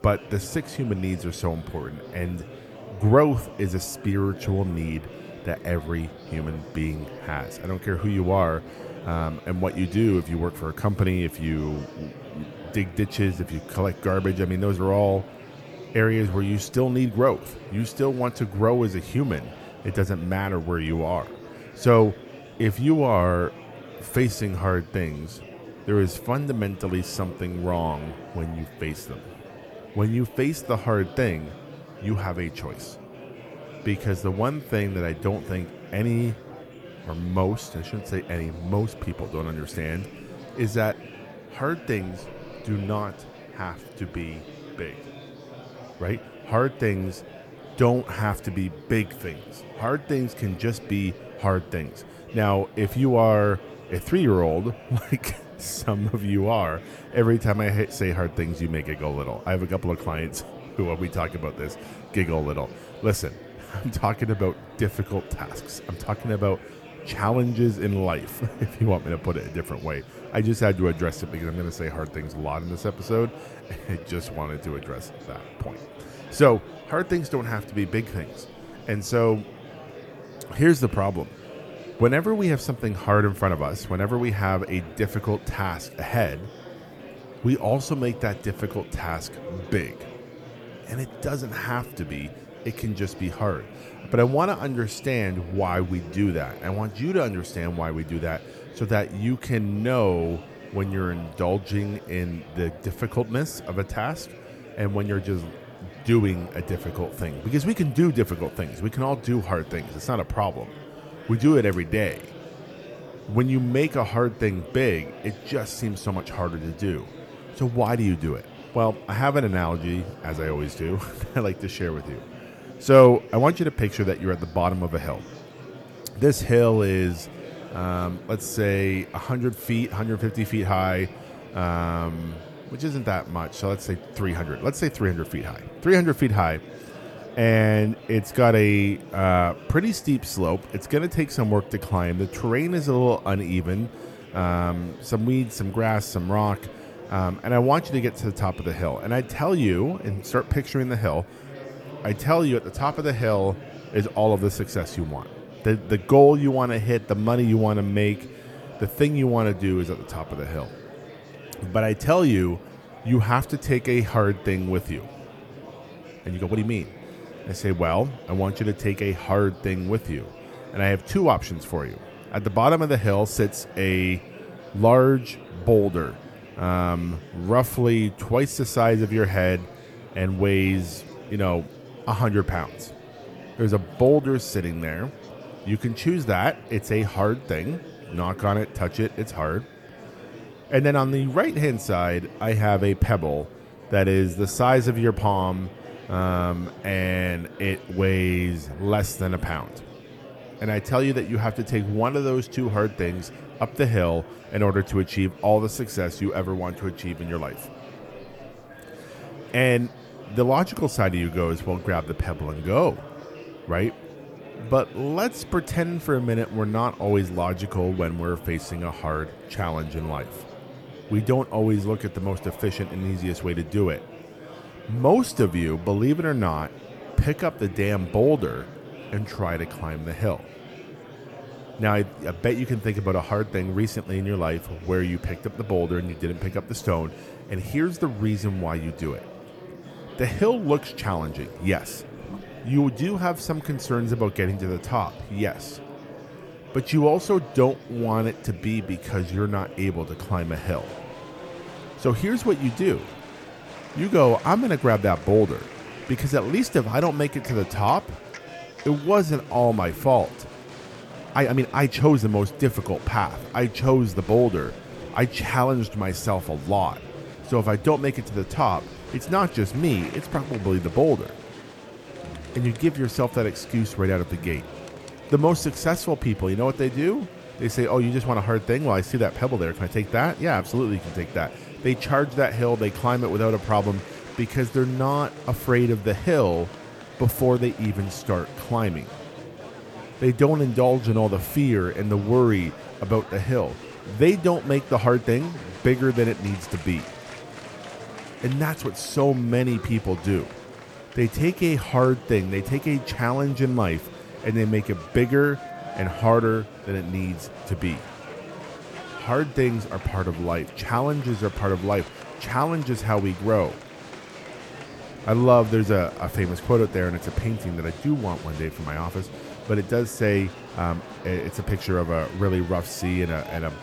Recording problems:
murmuring crowd; noticeable; throughout; 15 dB below the speech
uneven, jittery; strongly; from 1:14 to 4:55

